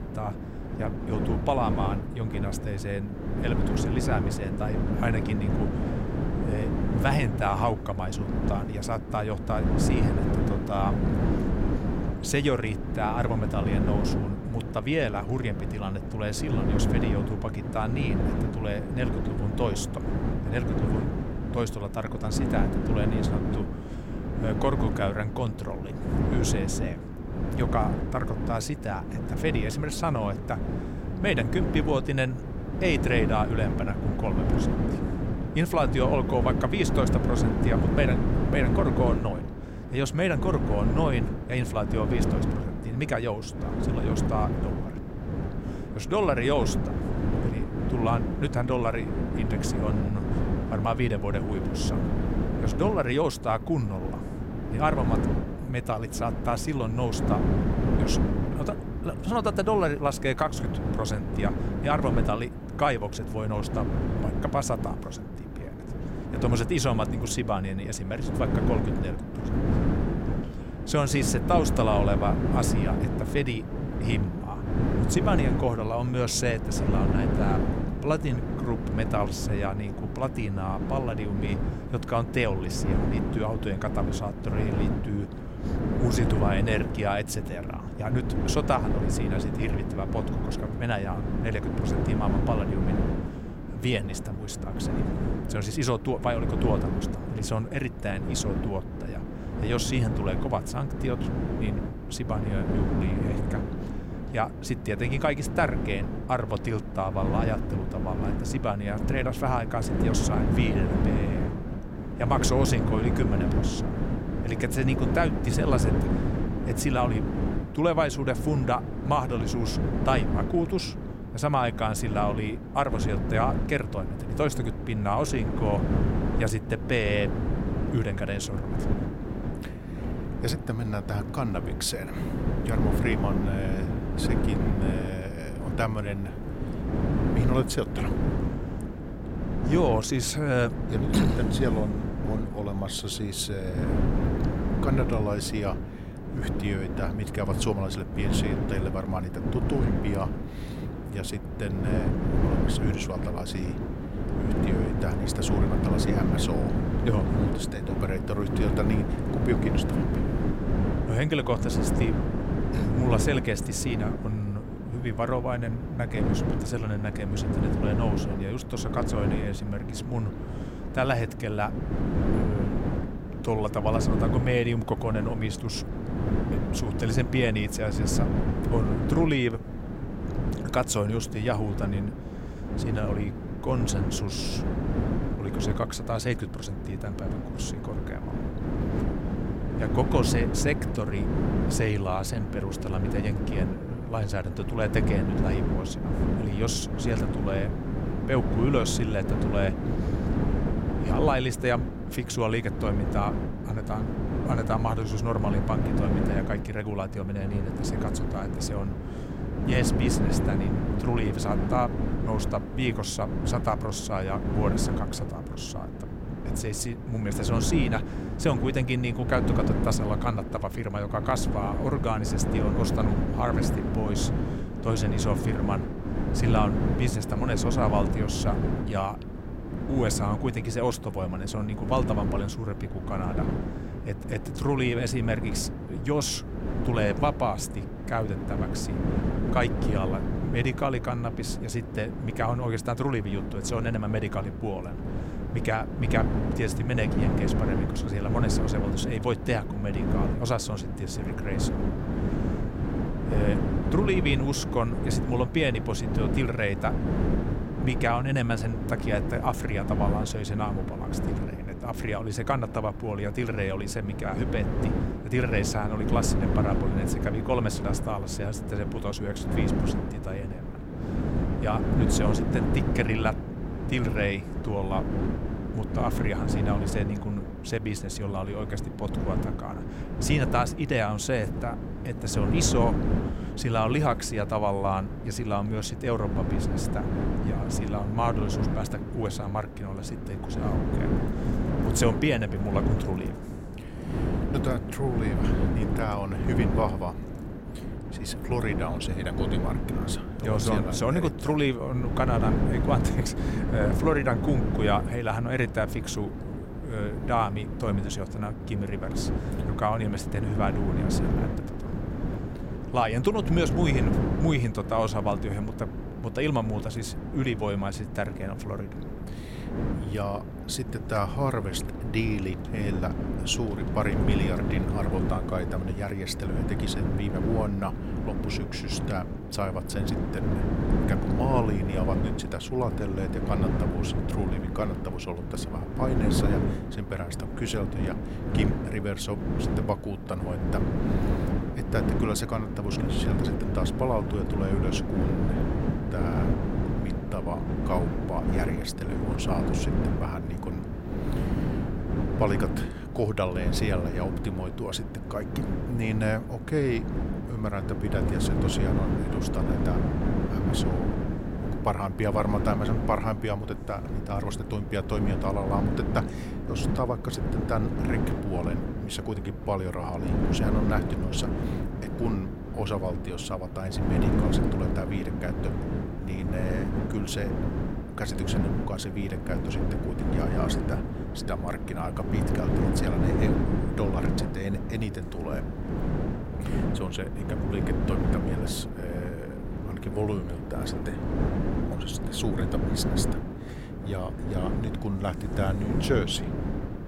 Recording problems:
wind noise on the microphone; heavy; 4 dB below the speech

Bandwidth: 16 kHz